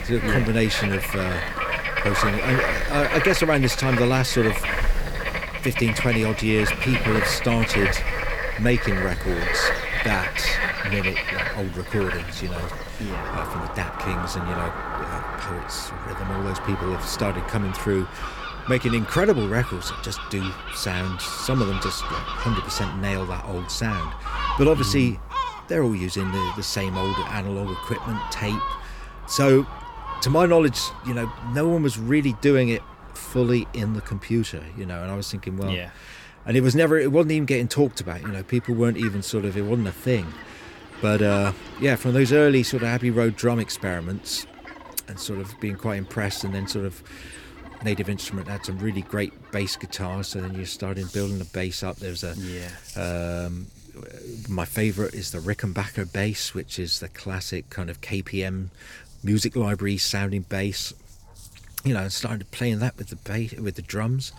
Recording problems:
animal sounds; loud; throughout; 4 dB below the speech

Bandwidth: 18 kHz